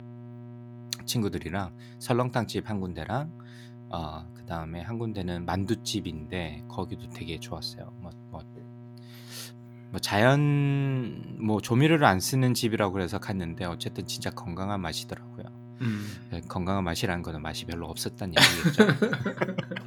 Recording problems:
electrical hum; faint; throughout; 60 Hz, 25 dB below the speech

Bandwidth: 18.5 kHz